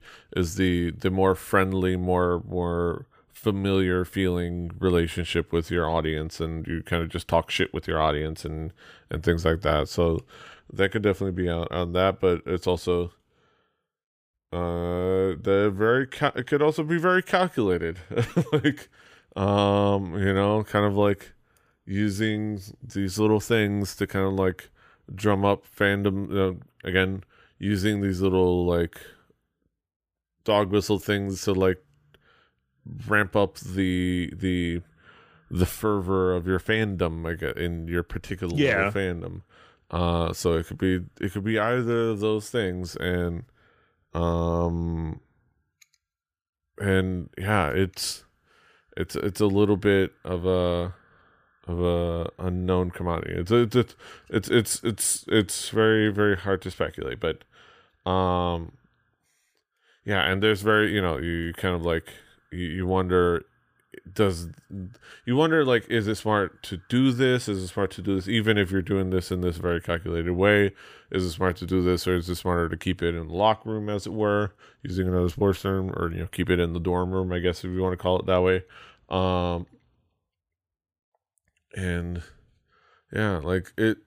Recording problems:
none

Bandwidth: 15 kHz